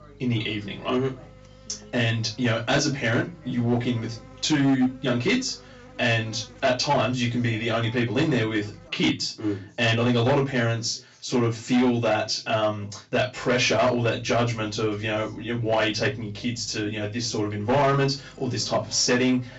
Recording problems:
off-mic speech; far
high frequencies cut off; noticeable; nothing above 7.5 kHz
distortion; slight; 6% of the sound clipped
room echo; very slight; dies away in 0.2 s
electrical hum; faint; until 9 s and from 14 s on; 50 Hz, 25 dB below the speech
voice in the background; faint; throughout; 30 dB below the speech

